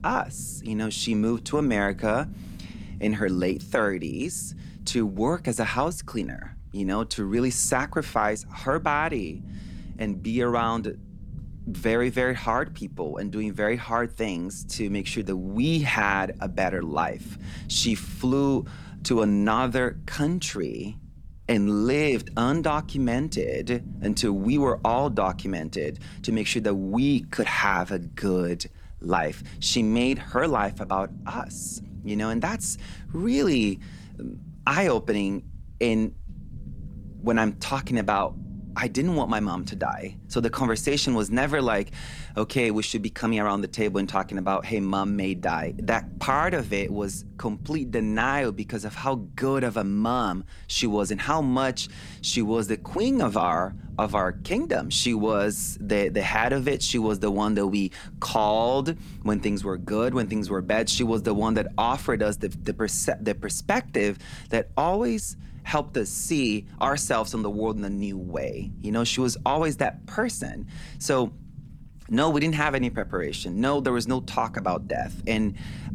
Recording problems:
low rumble; faint; throughout; 25 dB below the speech

